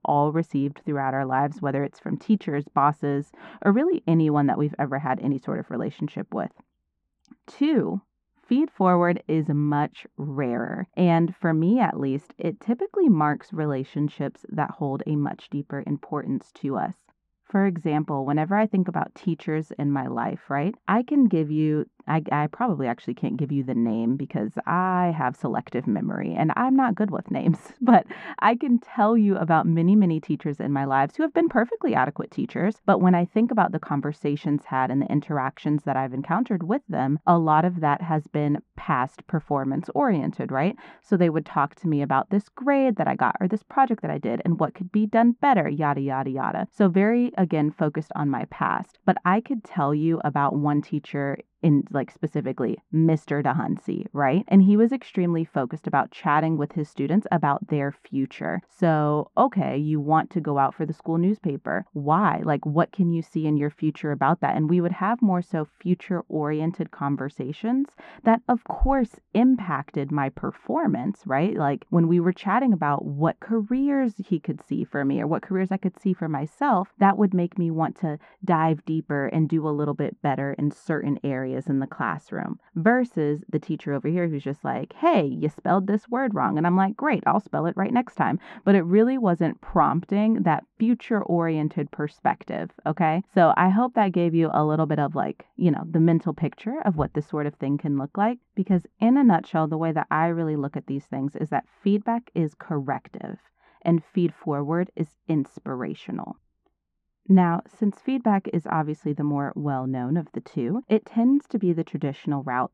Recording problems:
muffled; very; fading above 1 kHz

